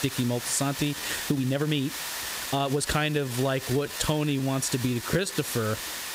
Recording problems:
squashed, flat; heavily
hiss; loud; throughout; 7 dB below the speech
uneven, jittery; strongly; from 1 to 5.5 s

